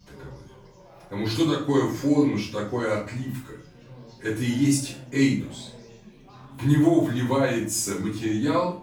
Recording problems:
off-mic speech; far
room echo; noticeable; dies away in 0.4 s
background chatter; faint; throughout; 4 voices, 25 dB below the speech

